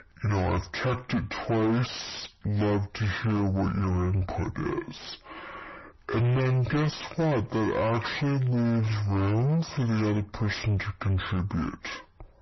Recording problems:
distortion; heavy; 6 dB below the speech
wrong speed and pitch; too slow and too low; 0.6 times normal speed
garbled, watery; slightly; nothing above 6 kHz

